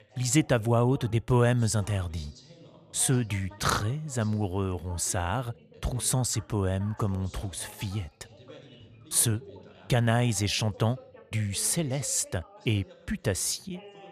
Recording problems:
background chatter; faint; throughout; 2 voices, 20 dB below the speech

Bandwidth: 14.5 kHz